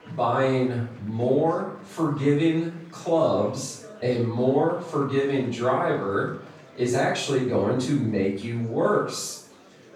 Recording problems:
off-mic speech; far
room echo; noticeable; dies away in 0.5 s
murmuring crowd; faint; throughout; 25 dB below the speech

